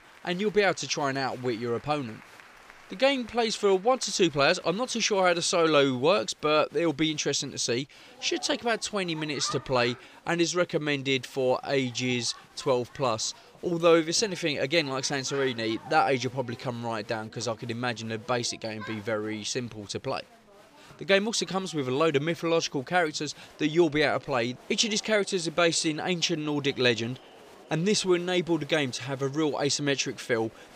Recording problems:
crowd noise; faint; throughout; 25 dB below the speech

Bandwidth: 15 kHz